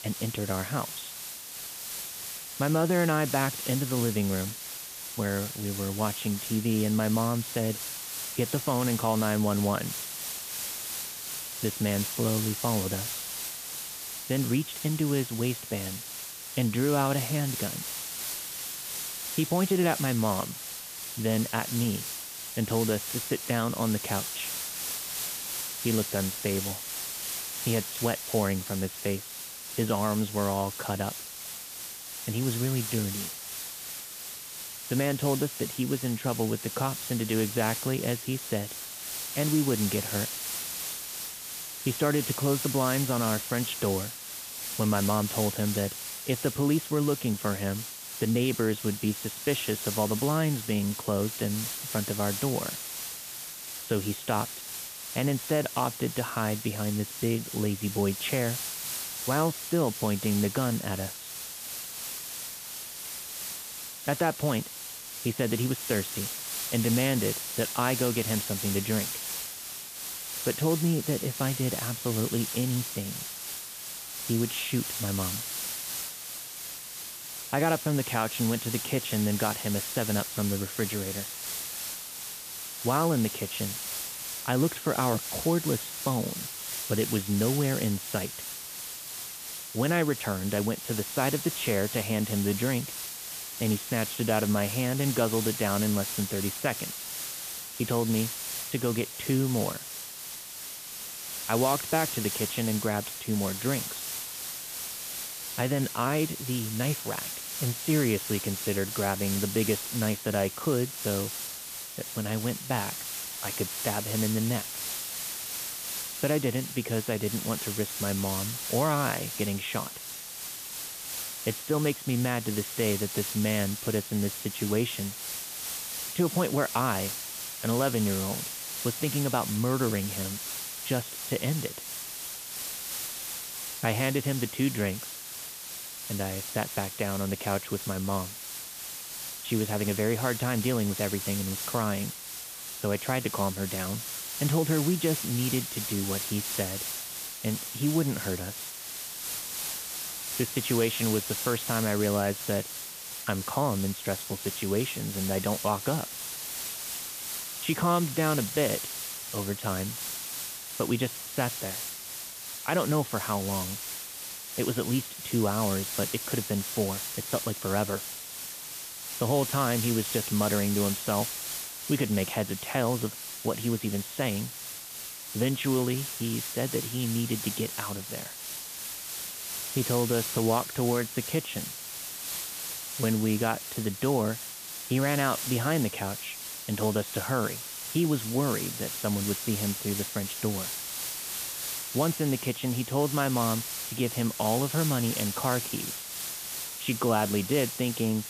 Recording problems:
high frequencies cut off; severe; nothing above 4 kHz
hiss; loud; throughout; 4 dB below the speech

